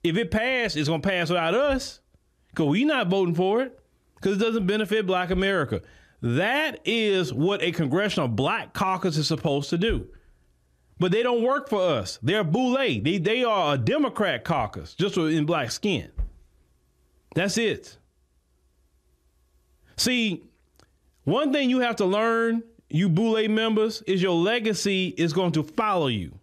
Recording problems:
squashed, flat; somewhat

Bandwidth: 14.5 kHz